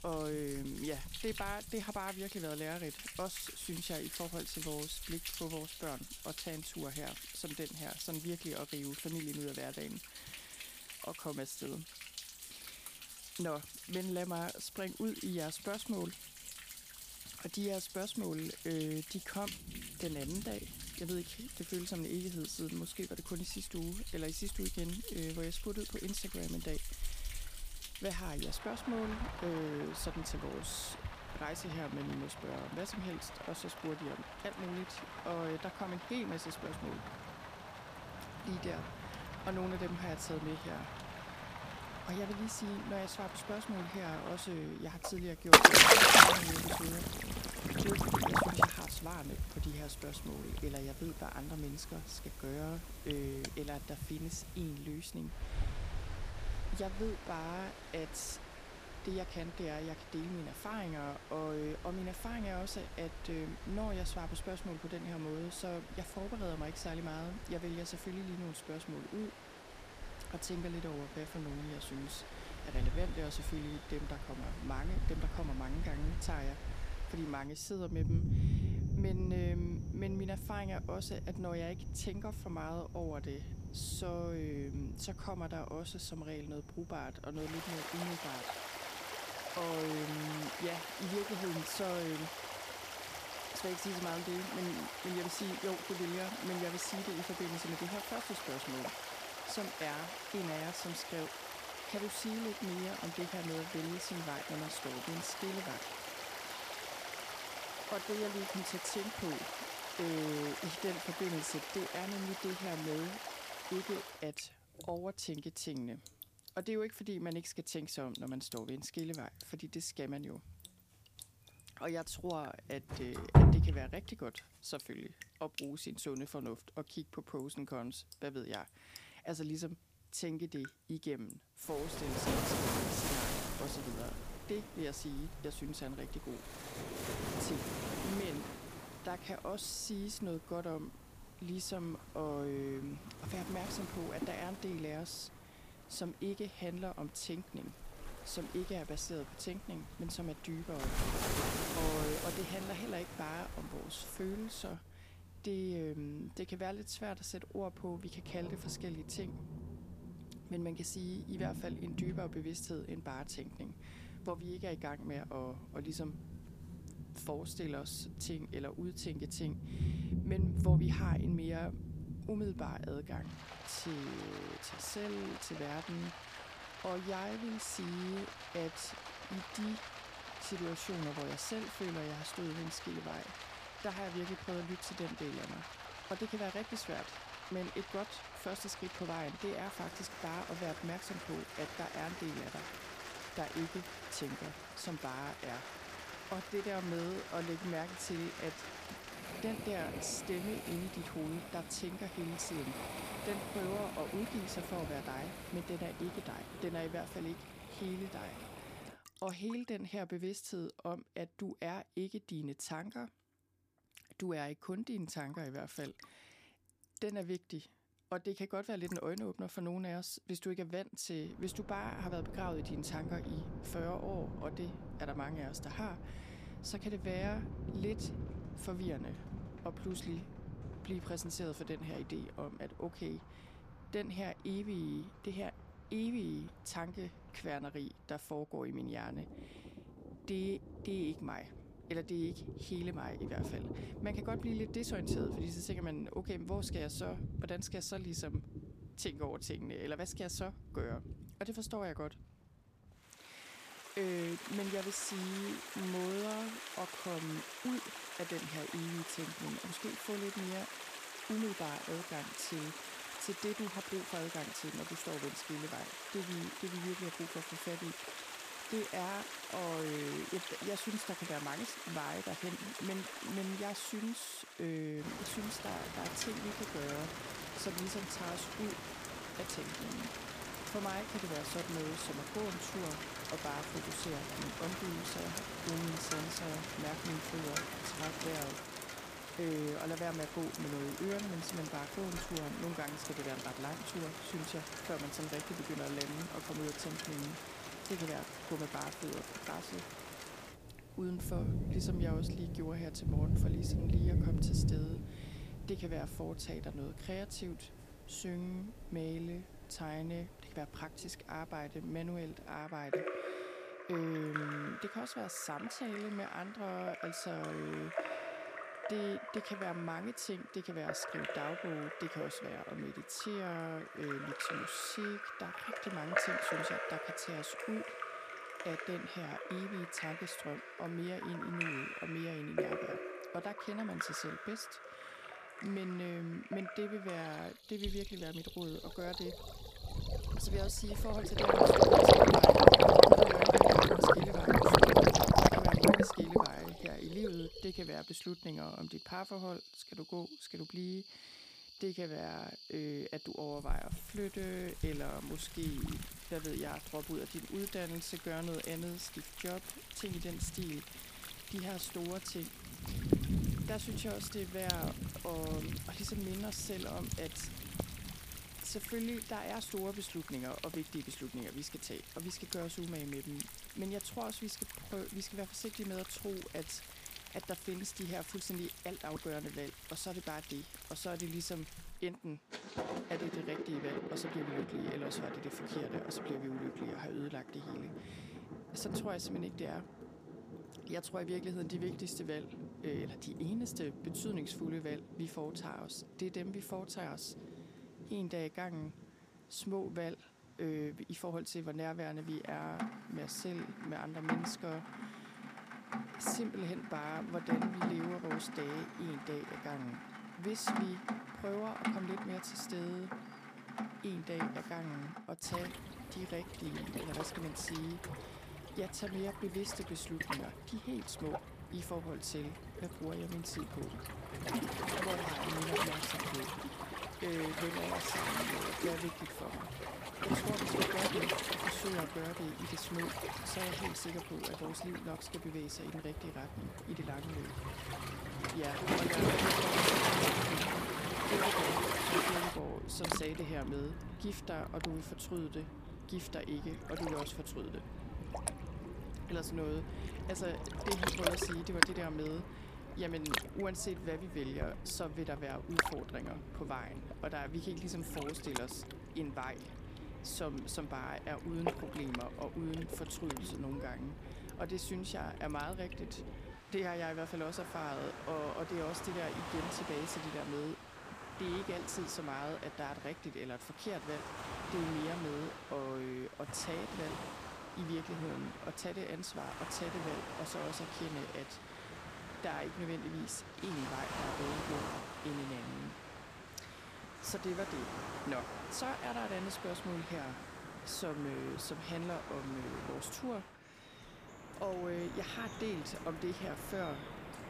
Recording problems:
rain or running water; very loud; throughout; 5 dB above the speech

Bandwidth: 15 kHz